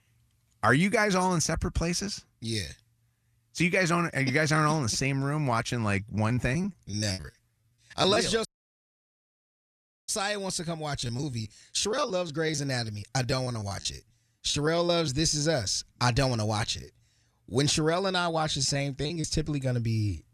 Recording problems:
choppy; very; from 6 to 8 s, from 11 to 15 s and at 18 s; 16% of the speech affected
audio cutting out; at 8.5 s for 1.5 s

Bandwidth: 14 kHz